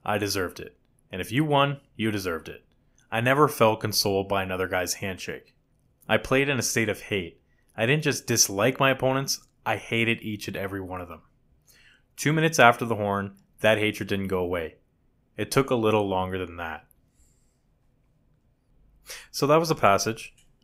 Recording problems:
none

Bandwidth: 15.5 kHz